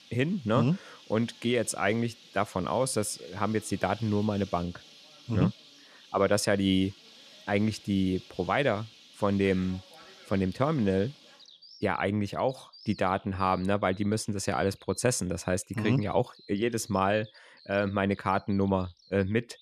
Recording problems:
animal sounds; faint; throughout; 20 dB below the speech

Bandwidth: 14.5 kHz